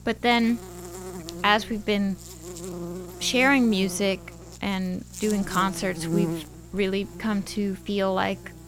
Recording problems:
electrical hum; noticeable; throughout; 60 Hz, 15 dB below the speech

